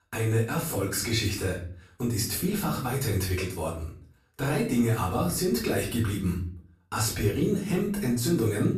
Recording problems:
off-mic speech; far
room echo; slight; dies away in 0.4 s

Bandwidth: 14.5 kHz